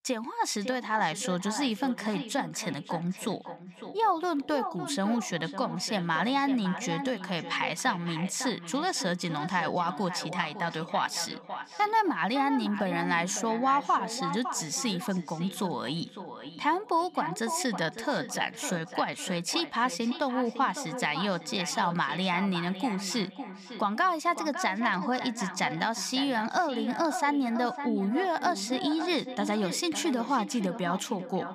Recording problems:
echo of what is said; strong; throughout; 560 ms later, 10 dB below the speech

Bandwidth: 15 kHz